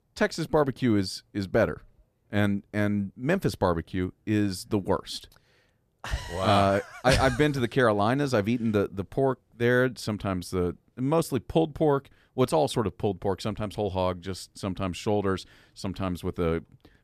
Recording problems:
none

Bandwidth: 14.5 kHz